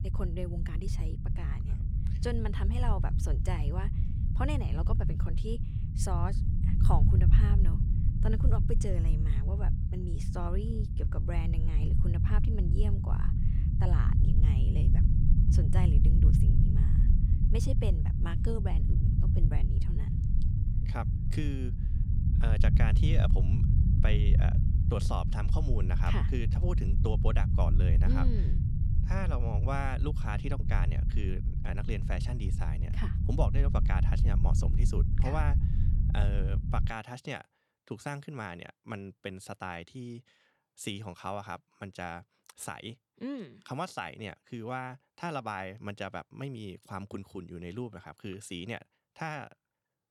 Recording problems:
low rumble; loud; until 37 s; 4 dB below the speech

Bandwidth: 18 kHz